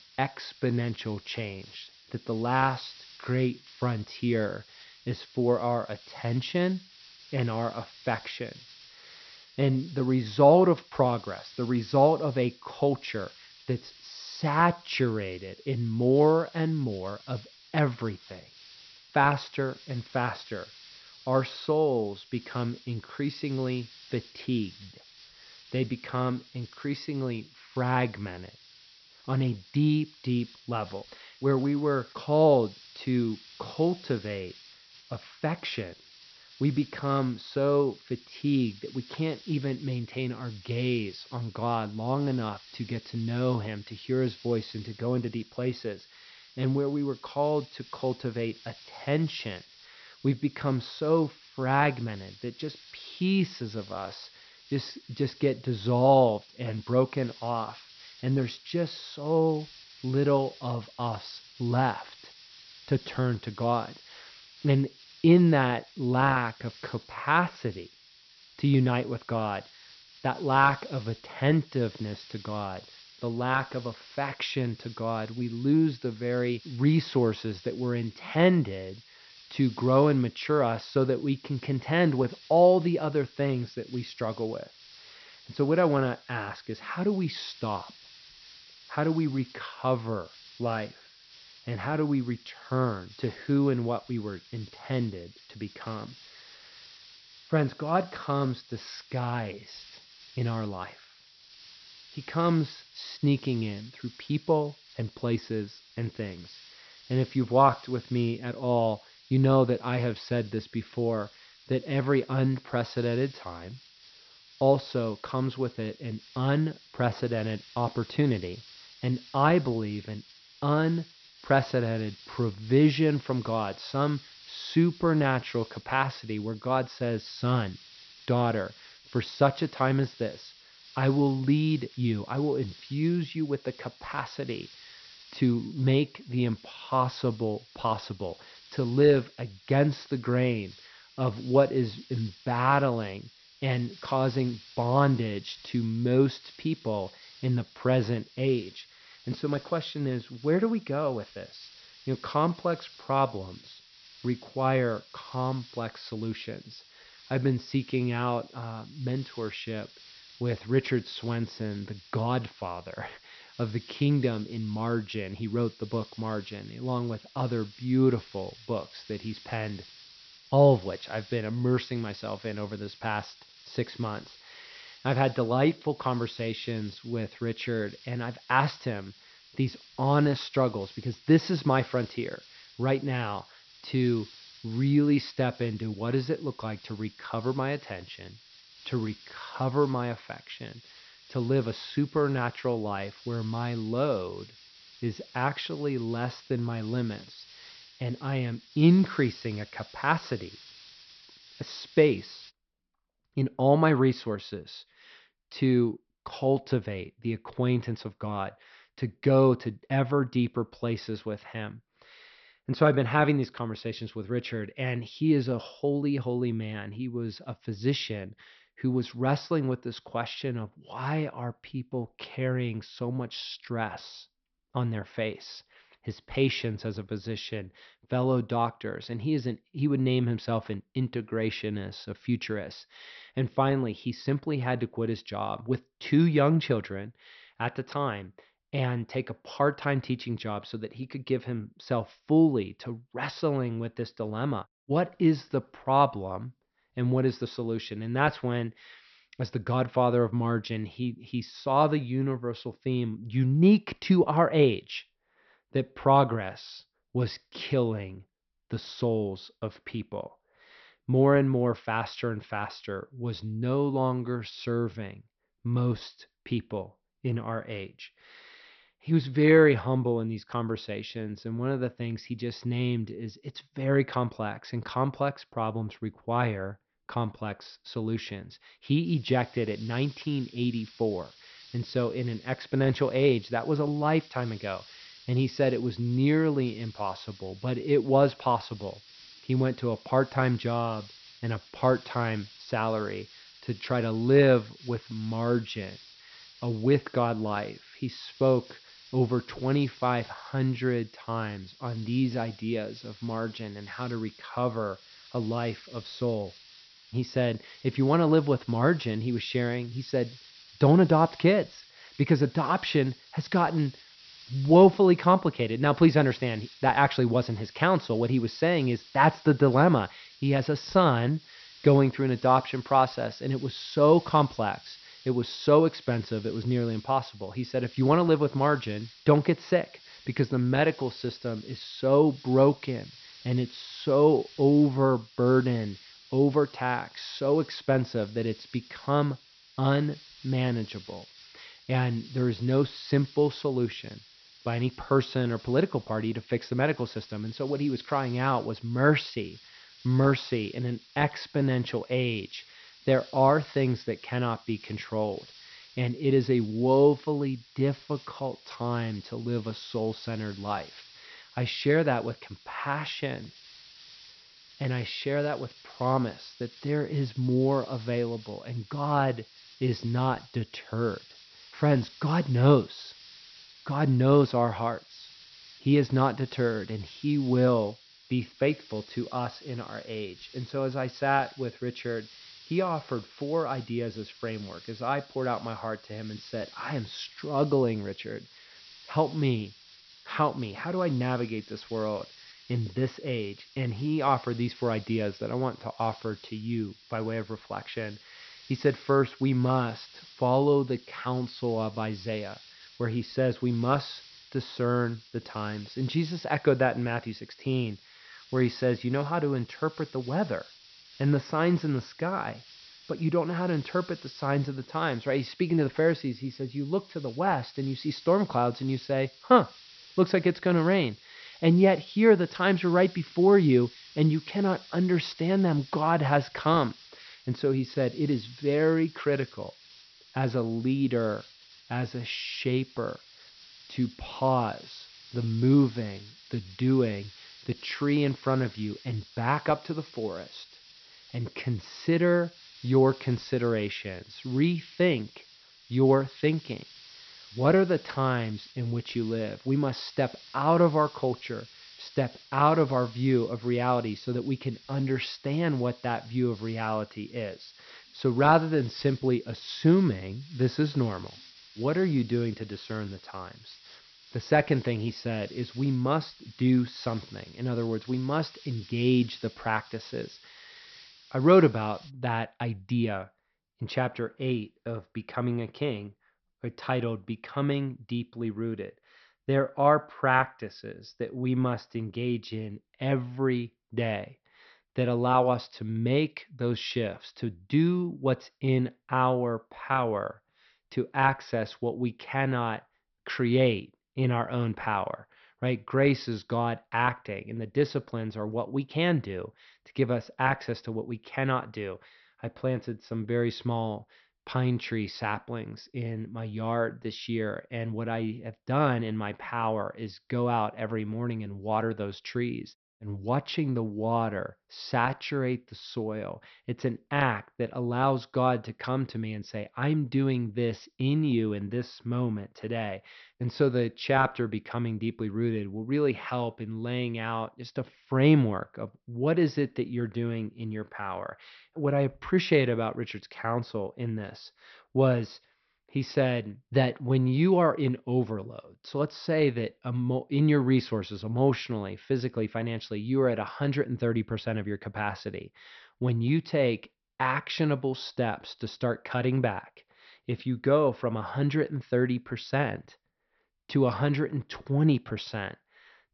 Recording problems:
high frequencies cut off; noticeable; nothing above 5.5 kHz
hiss; faint; until 3:23 and from 4:39 to 7:52; 20 dB below the speech

